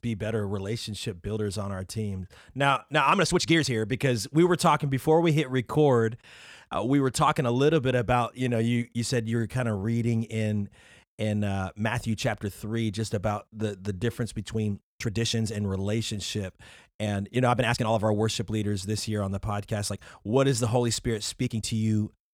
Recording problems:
uneven, jittery; strongly; from 1 to 22 s

